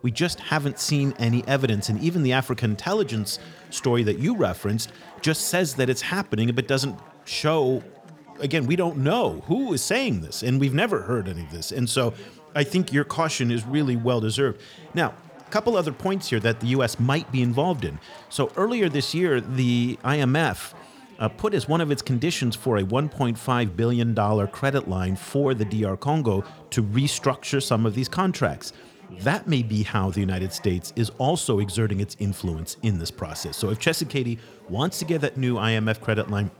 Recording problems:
chatter from many people; faint; throughout; 25 dB below the speech

